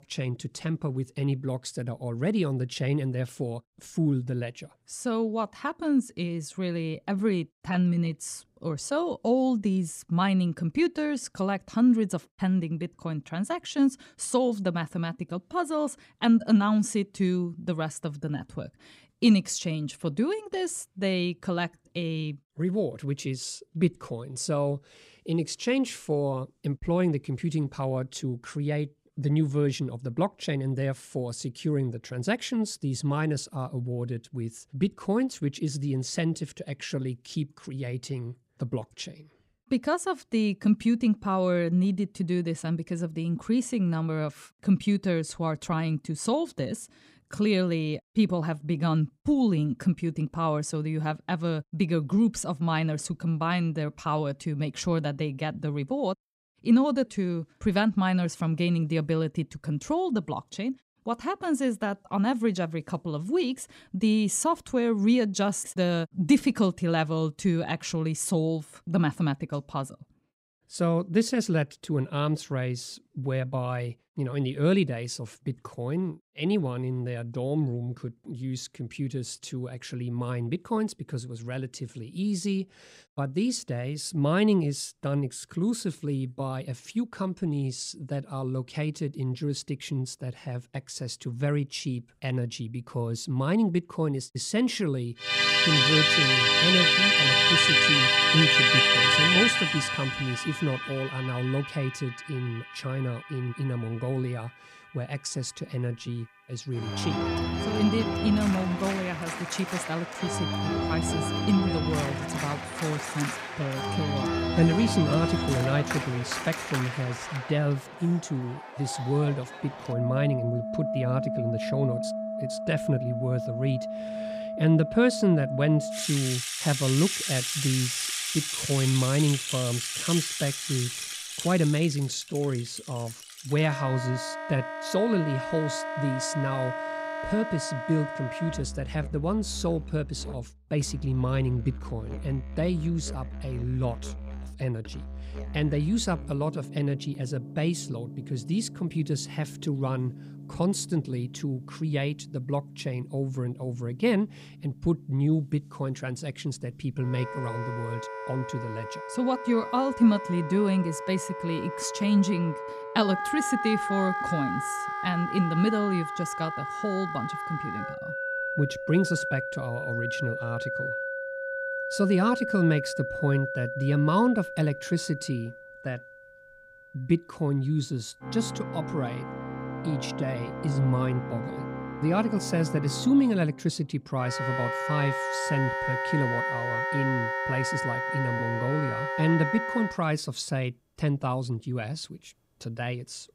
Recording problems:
background music; very loud; from 1:35 on; as loud as the speech

